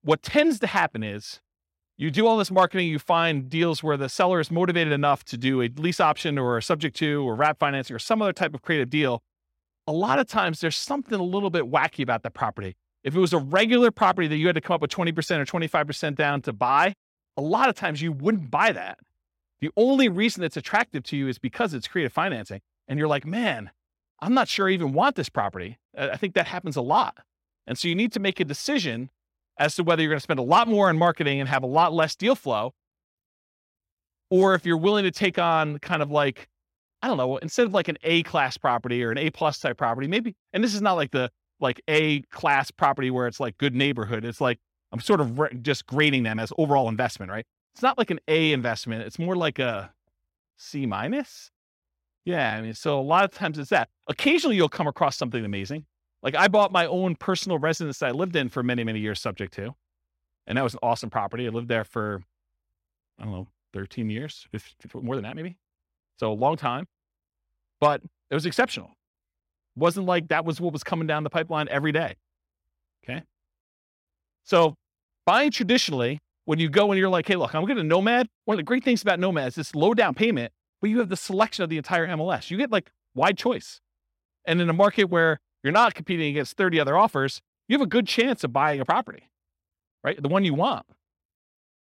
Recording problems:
uneven, jittery; strongly; from 16 s to 1:30

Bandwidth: 16 kHz